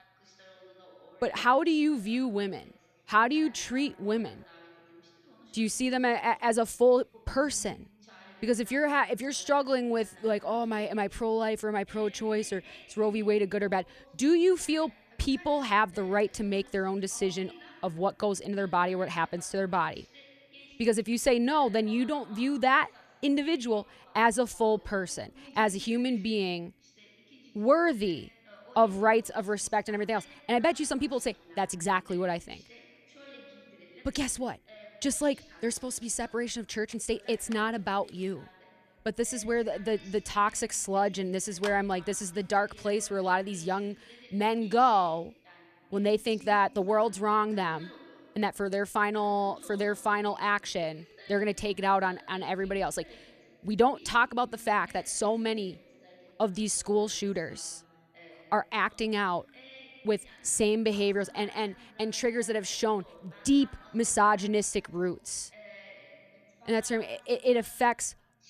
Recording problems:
voice in the background; faint; throughout; 25 dB below the speech

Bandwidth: 14.5 kHz